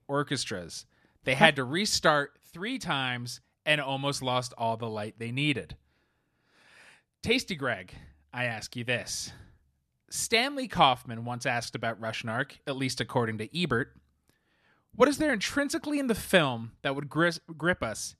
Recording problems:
none

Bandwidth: 13.5 kHz